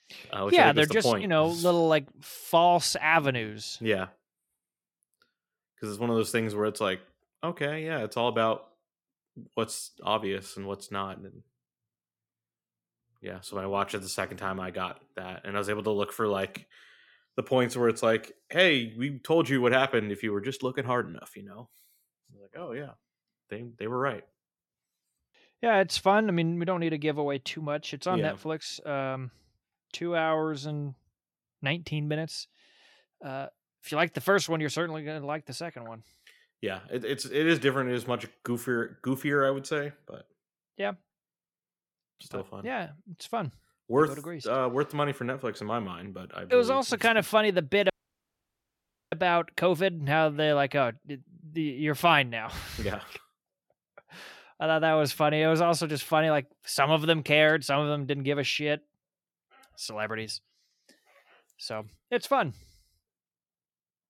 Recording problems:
audio cutting out; at 48 s for 1 s

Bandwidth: 17 kHz